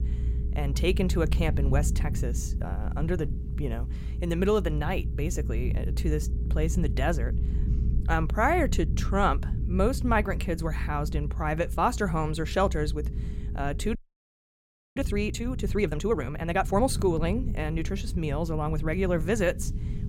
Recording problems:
low rumble; noticeable; throughout; 15 dB below the speech
audio freezing; at 14 s for 1 s

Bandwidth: 16.5 kHz